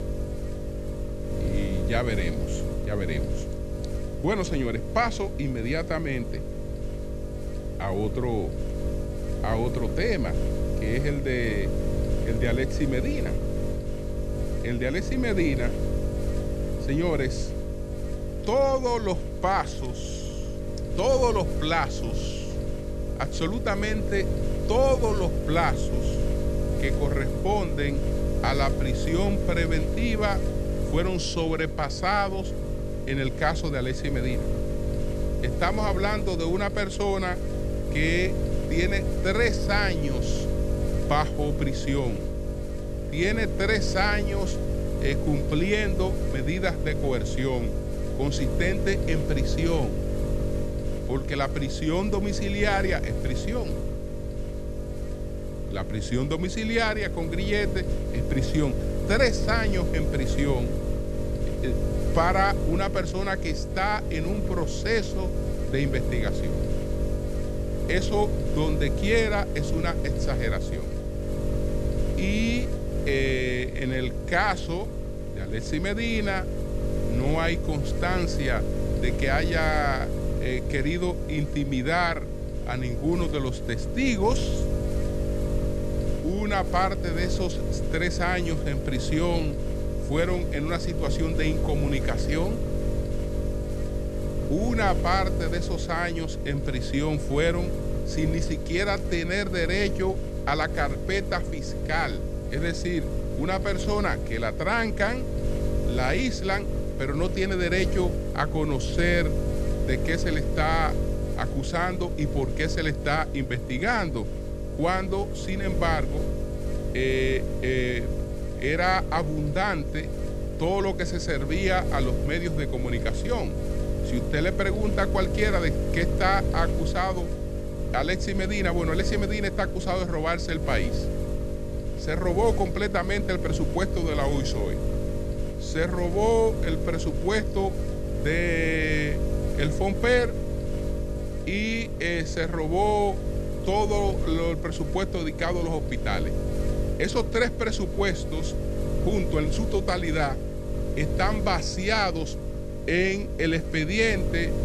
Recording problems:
electrical hum; loud; throughout; 50 Hz, 7 dB below the speech

